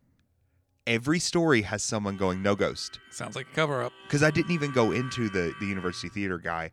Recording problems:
background music; noticeable; from 2 s on; 15 dB below the speech

